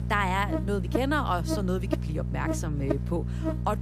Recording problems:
electrical hum; loud; throughout; 60 Hz, 6 dB below the speech

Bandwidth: 14.5 kHz